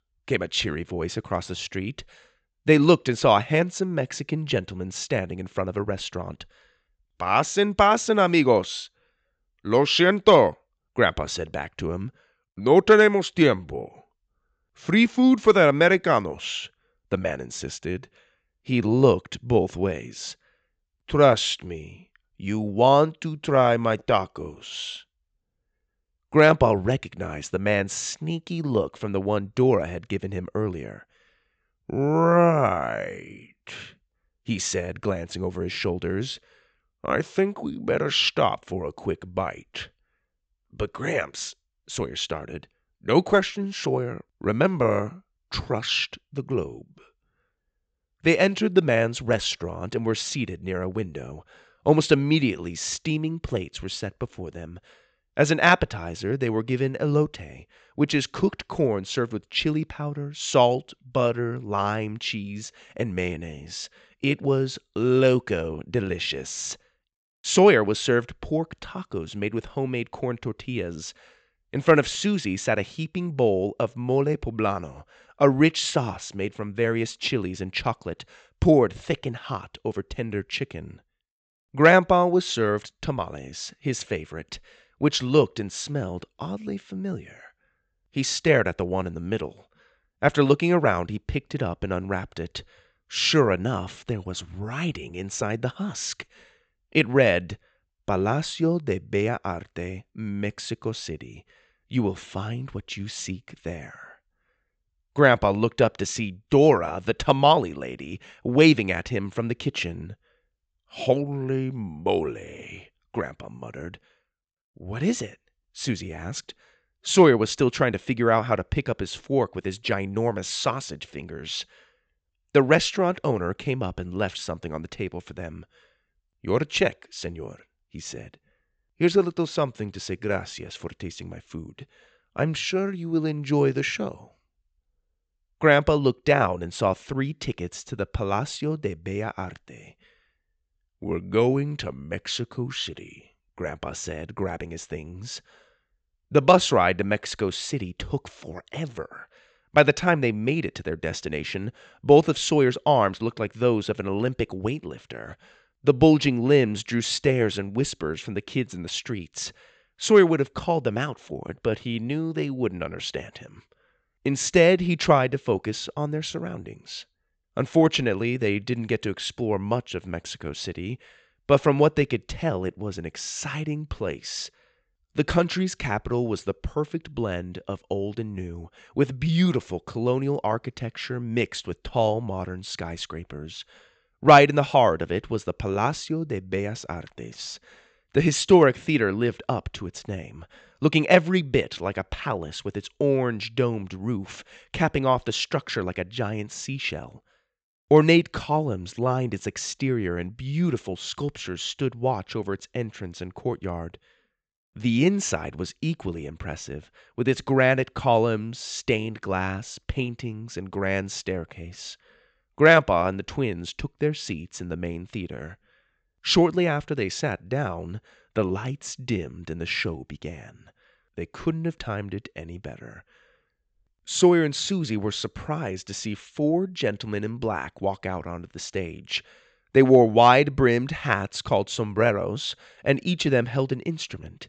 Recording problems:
high frequencies cut off; noticeable; nothing above 8 kHz

